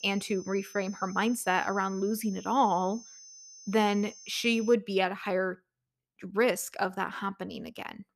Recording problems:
high-pitched whine; noticeable; until 4.5 s; 6 kHz, 20 dB below the speech

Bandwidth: 14.5 kHz